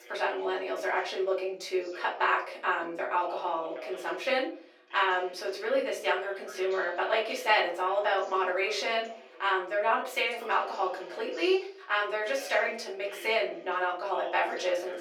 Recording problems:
off-mic speech; far
thin; very; fading below 400 Hz
room echo; slight; dies away in 0.6 s
voice in the background; noticeable; throughout; 20 dB below the speech

